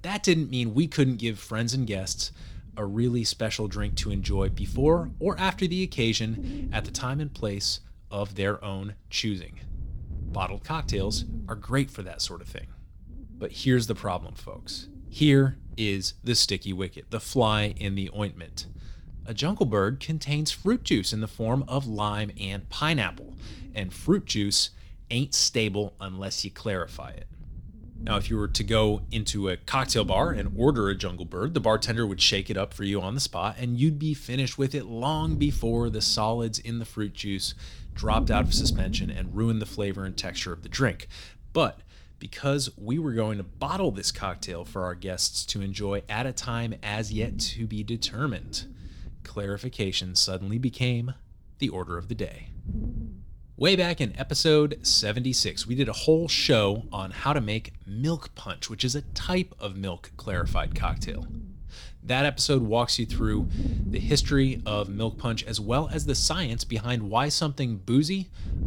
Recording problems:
wind noise on the microphone; occasional gusts; 20 dB below the speech

